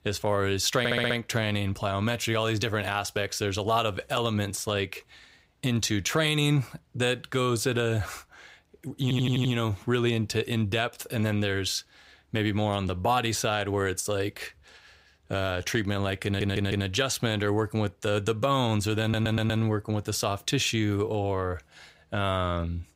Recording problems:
audio stuttering; 4 times, first at 1 s

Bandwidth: 15.5 kHz